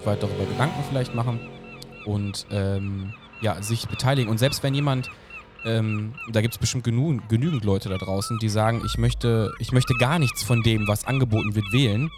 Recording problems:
animal sounds; noticeable; throughout; 10 dB below the speech
traffic noise; noticeable; throughout; 15 dB below the speech

